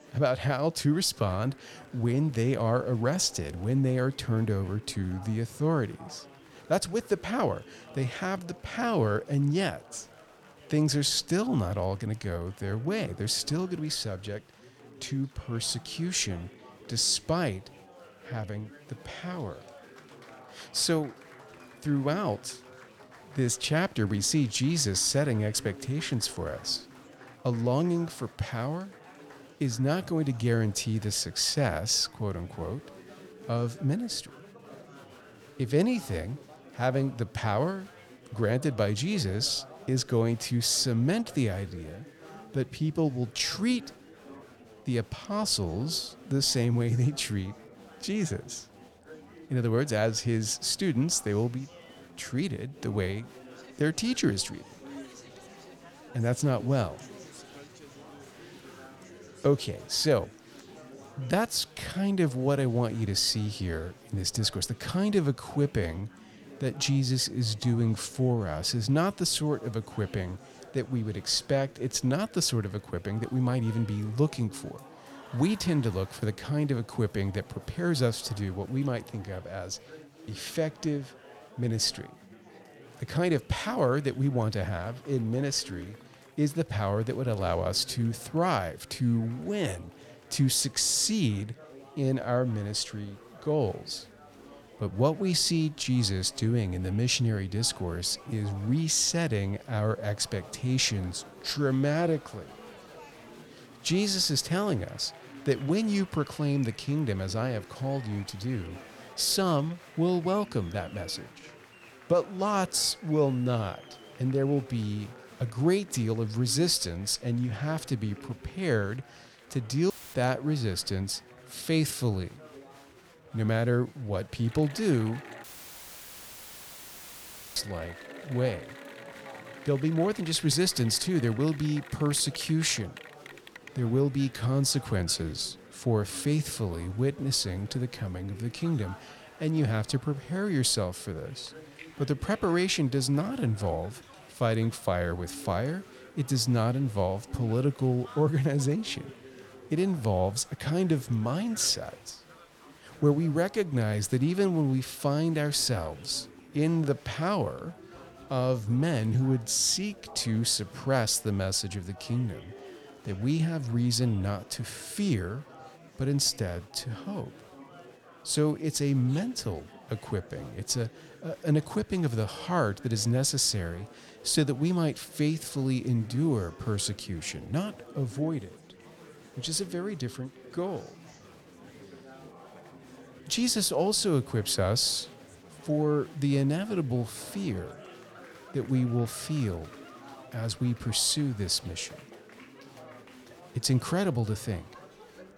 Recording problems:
chatter from many people; faint; throughout; 20 dB below the speech
audio cutting out; filled with static; at 2:00 and at 2:05 for 2 s

